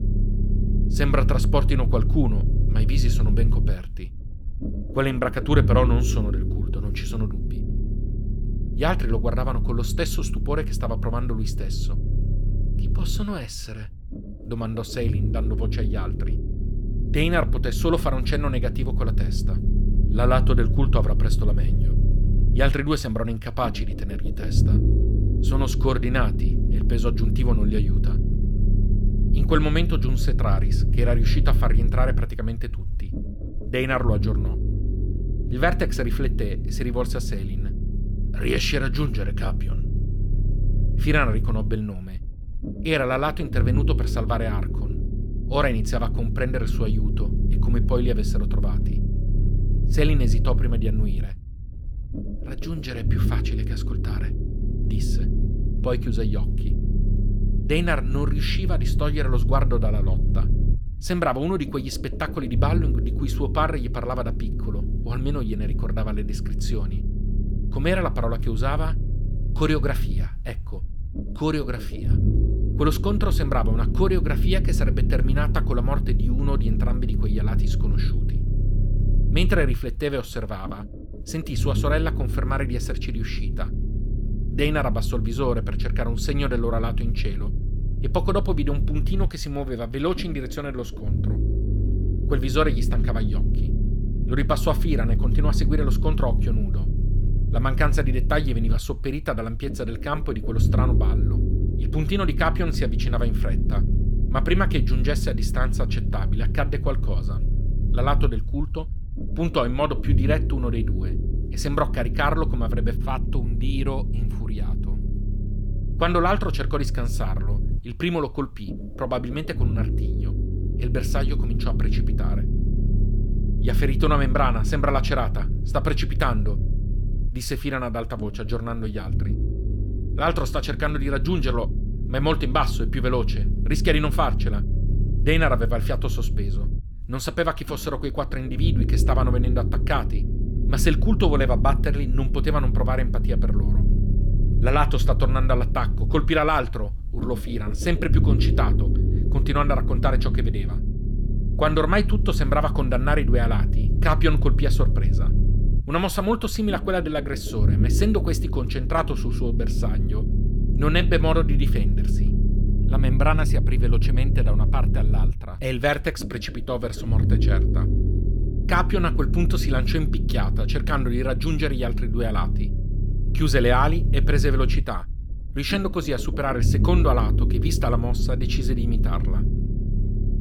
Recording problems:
low rumble; noticeable; throughout; 10 dB below the speech

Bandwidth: 18.5 kHz